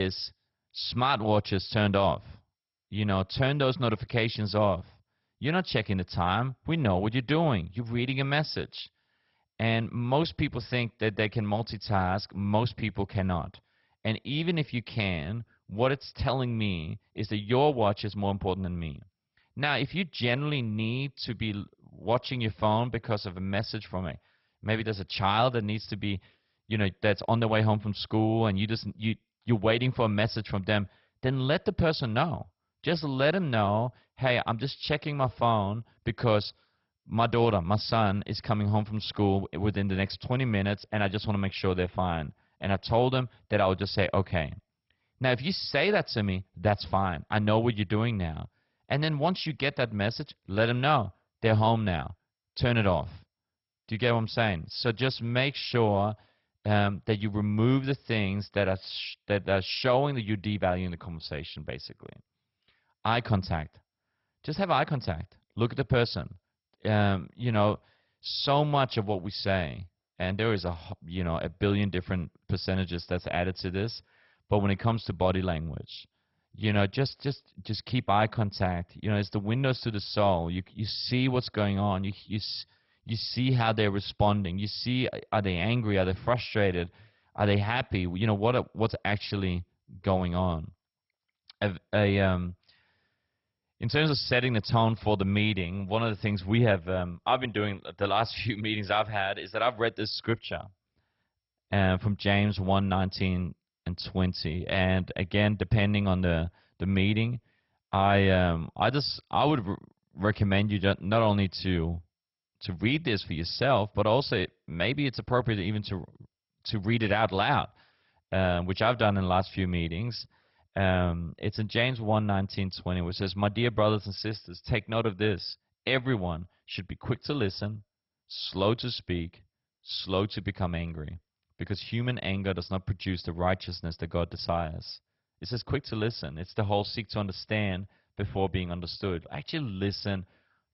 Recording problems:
garbled, watery; badly; nothing above 5.5 kHz
abrupt cut into speech; at the start

